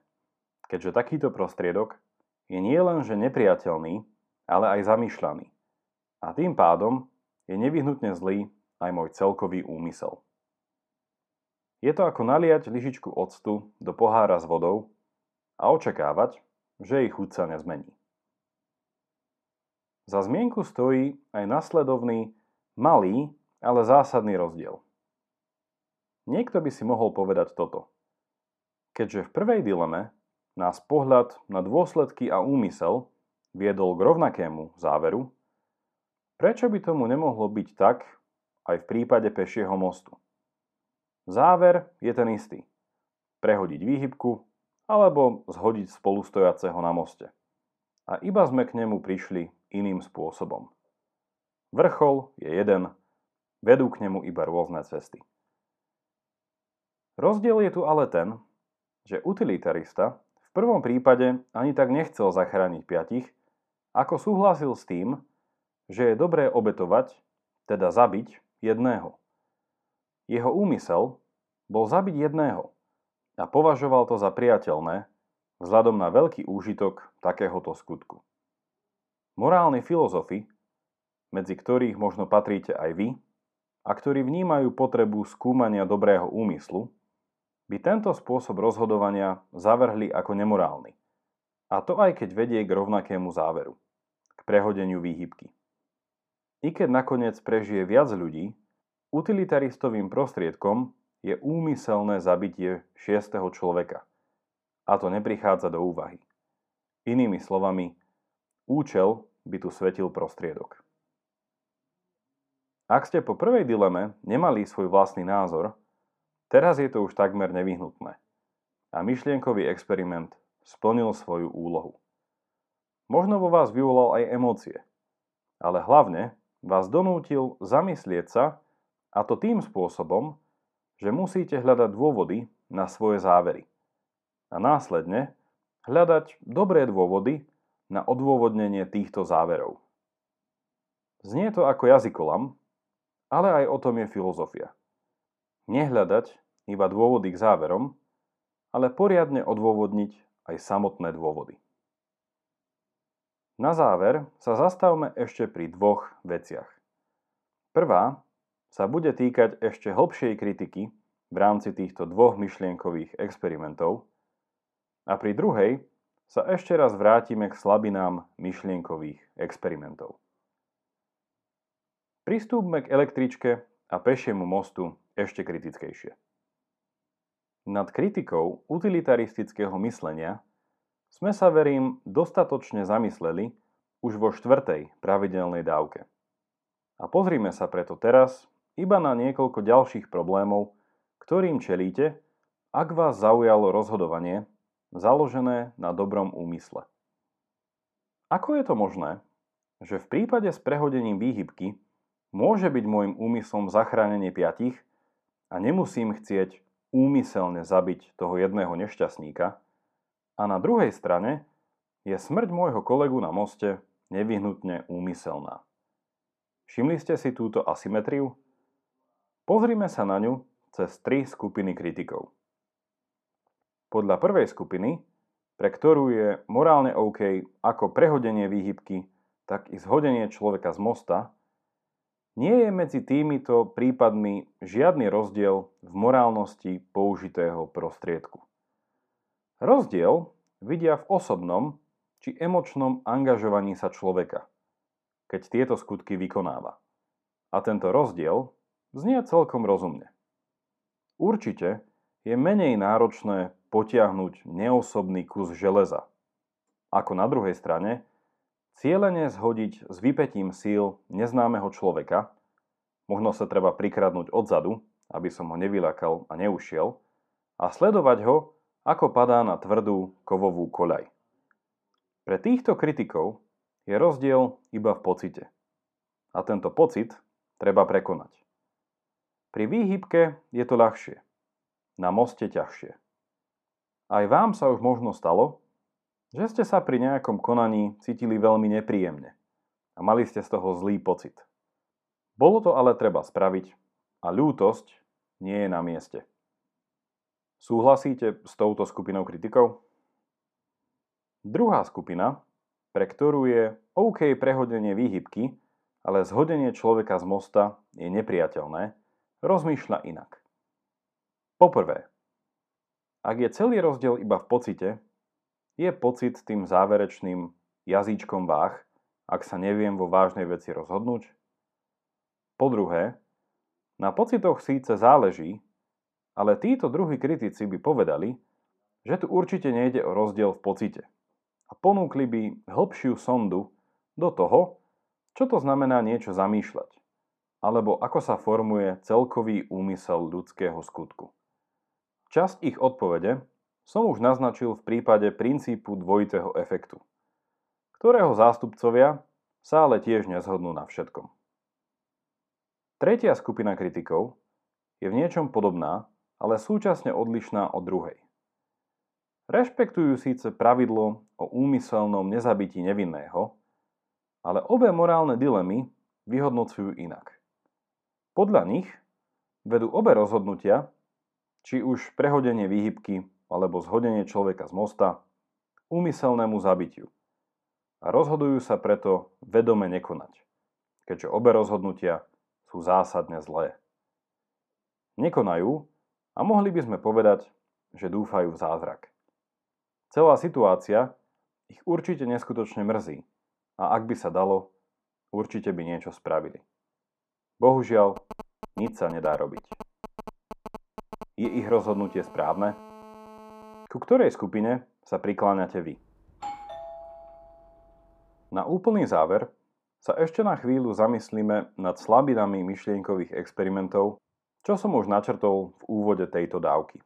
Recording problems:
muffled; slightly; fading above 2 kHz
phone ringing; faint; from 6:38 to 6:44; peak 20 dB below the speech
doorbell; faint; from 6:46 to 6:48; peak 15 dB below the speech

